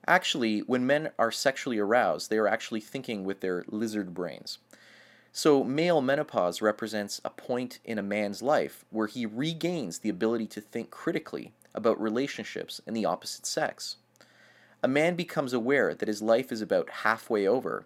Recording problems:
none

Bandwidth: 16.5 kHz